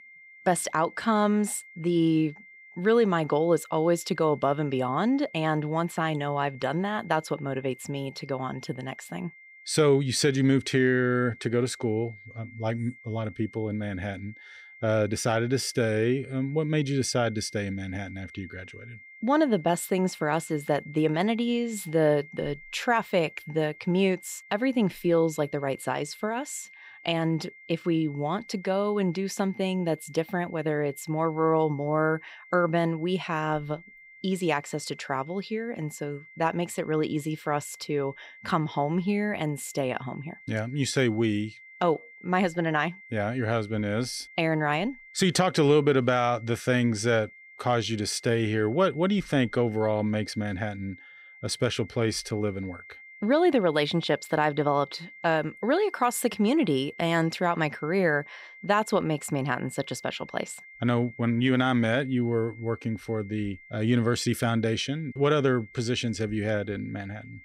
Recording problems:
high-pitched whine; faint; throughout; 2 kHz, 20 dB below the speech

